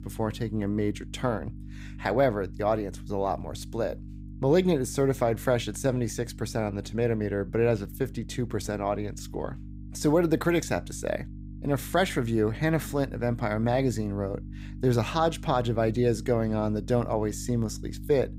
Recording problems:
electrical hum; faint; throughout; 50 Hz, 20 dB below the speech

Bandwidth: 15.5 kHz